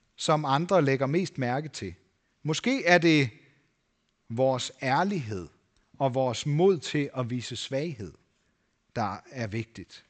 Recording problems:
high frequencies cut off; noticeable; nothing above 8 kHz

